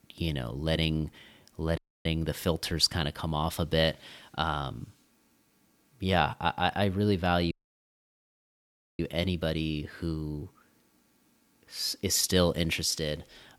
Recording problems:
audio cutting out; at 2 s and at 7.5 s for 1.5 s

